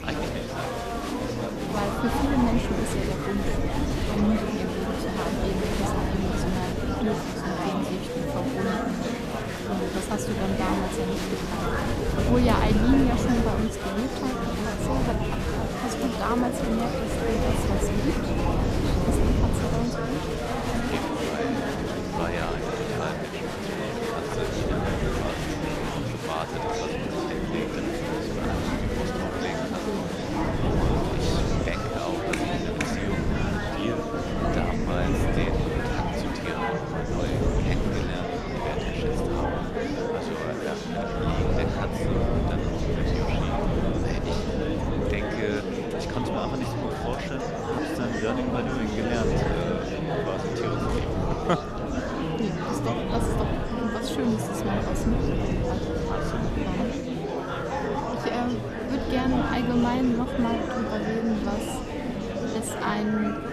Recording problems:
murmuring crowd; very loud; throughout; 2 dB above the speech
wind noise on the microphone; heavy; 4 dB below the speech

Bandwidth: 14 kHz